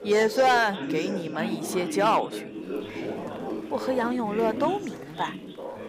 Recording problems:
background chatter; loud; throughout; 4 voices, 7 dB below the speech
rain or running water; faint; throughout; 25 dB below the speech

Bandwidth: 15.5 kHz